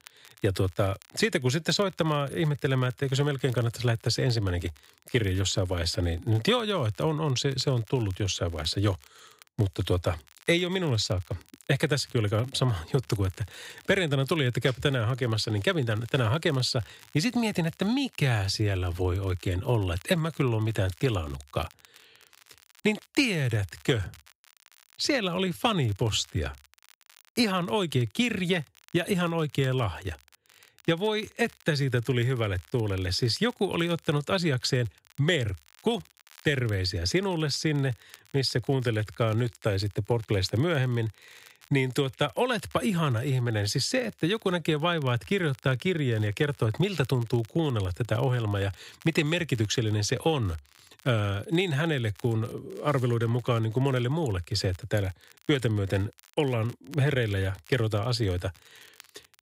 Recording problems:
crackle, like an old record; faint; 25 dB below the speech

